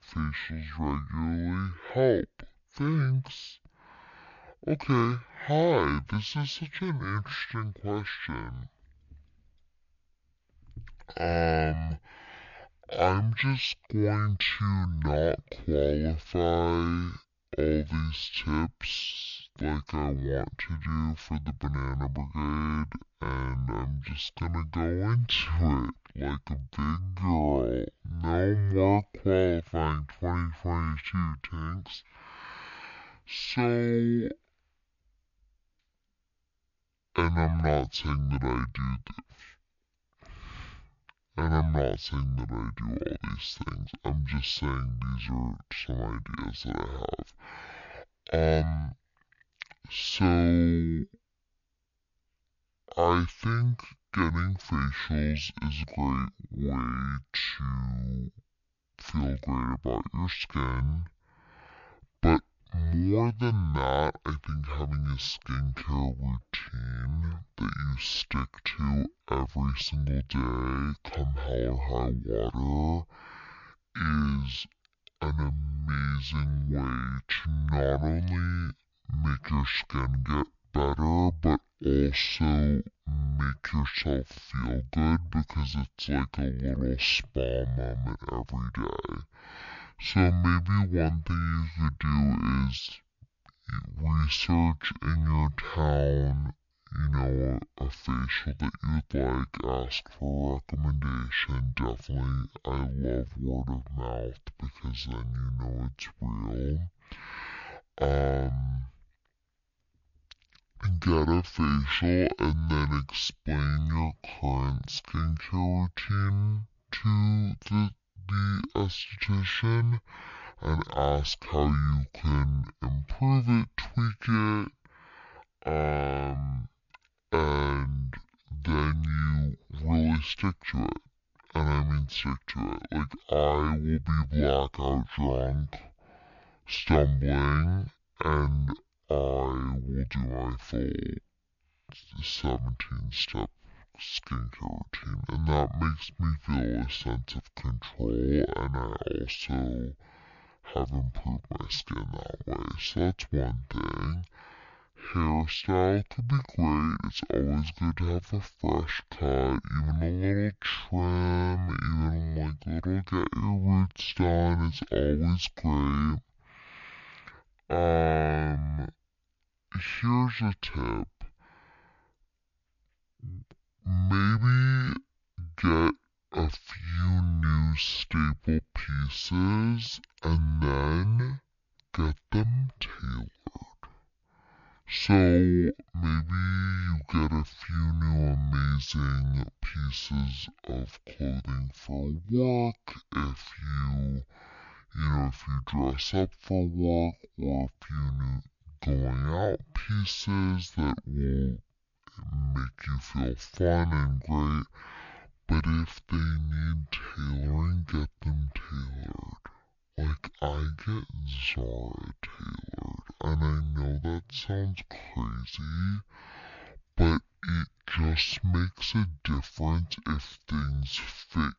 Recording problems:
wrong speed and pitch; too slow and too low; 0.5 times normal speed

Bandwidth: 7 kHz